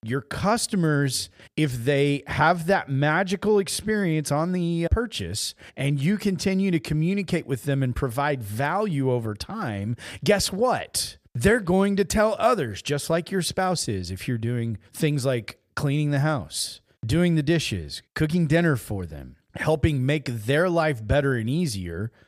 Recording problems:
none

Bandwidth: 15 kHz